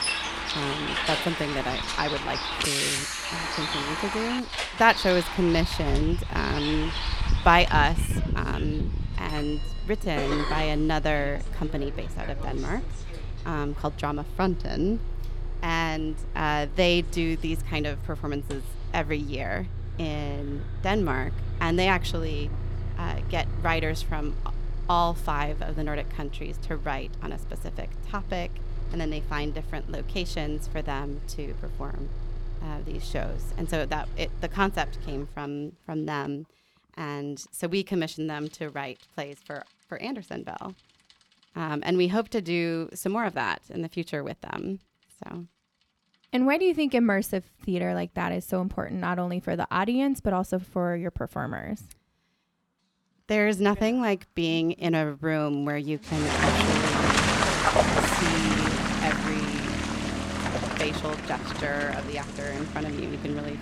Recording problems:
traffic noise; loud; throughout; 2 dB below the speech

